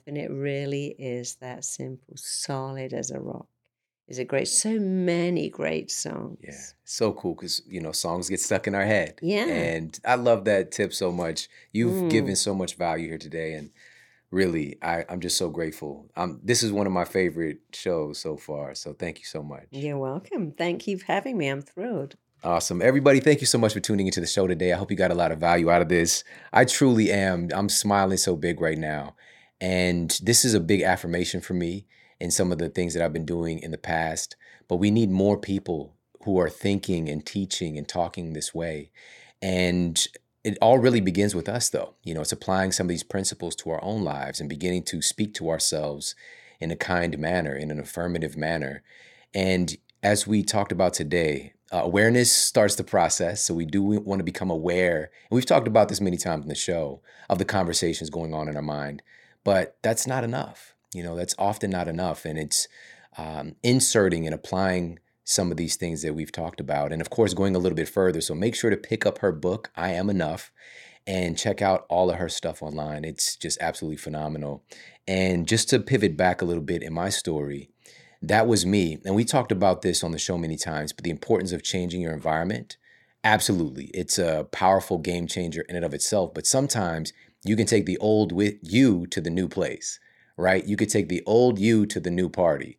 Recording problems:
none

